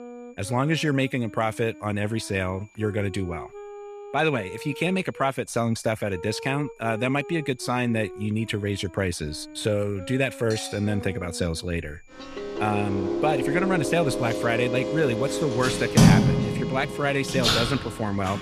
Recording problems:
household noises; very loud; throughout; 3 dB above the speech
background music; loud; throughout; 7 dB below the speech
high-pitched whine; faint; throughout; 2.5 kHz, 30 dB below the speech

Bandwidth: 14.5 kHz